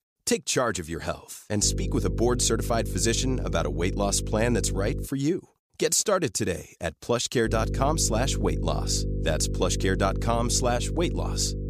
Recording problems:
electrical hum; noticeable; from 1.5 to 5 s and from 7.5 s on; 50 Hz, 15 dB below the speech

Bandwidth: 15 kHz